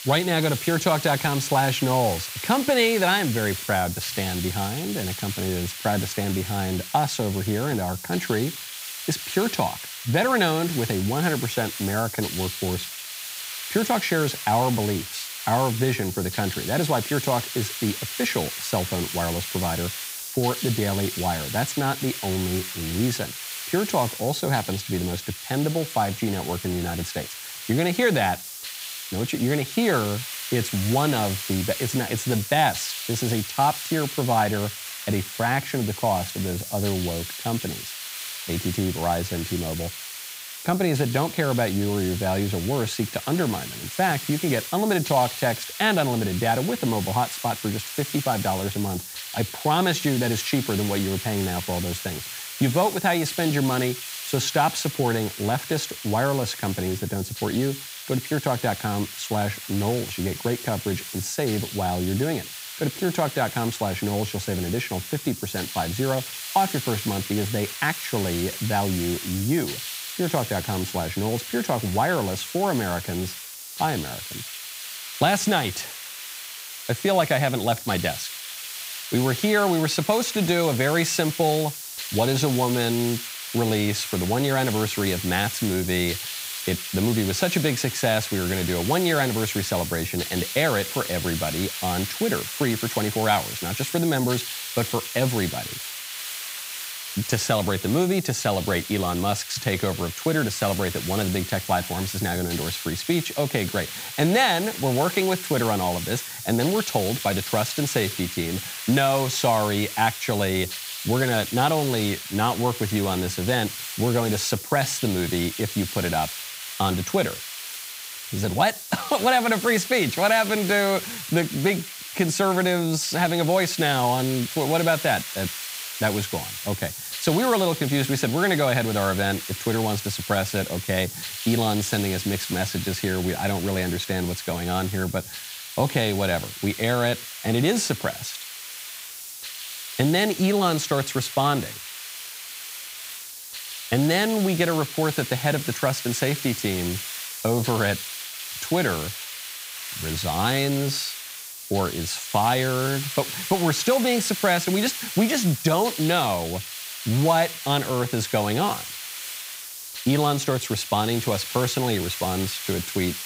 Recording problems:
hiss; loud; throughout; 7 dB below the speech

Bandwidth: 15.5 kHz